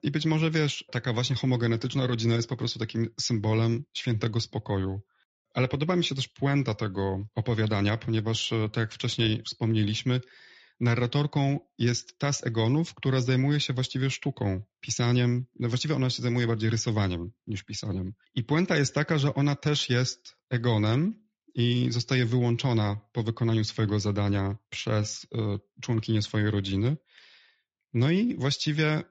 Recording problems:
garbled, watery; slightly; nothing above 7 kHz

